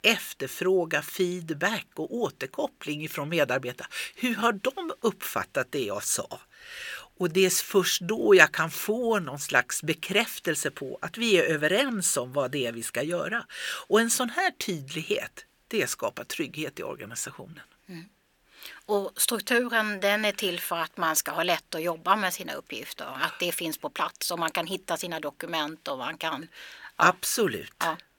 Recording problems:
thin; very slightly; fading below 400 Hz

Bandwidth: 18 kHz